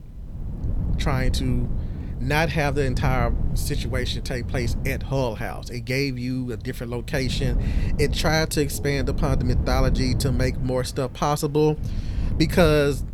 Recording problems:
rain or running water; noticeable; from 7 s on; 20 dB below the speech
wind noise on the microphone; occasional gusts; 15 dB below the speech

